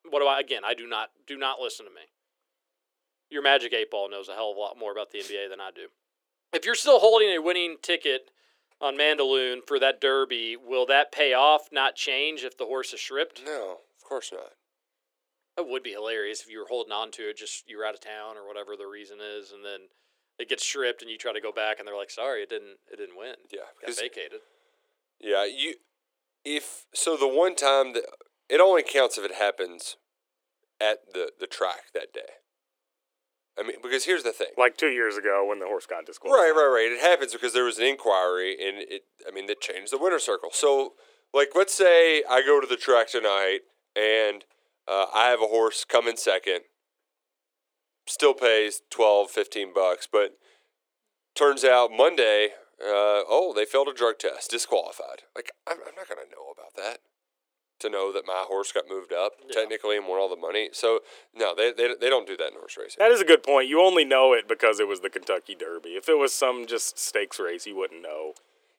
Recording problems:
thin; very; fading below 350 Hz

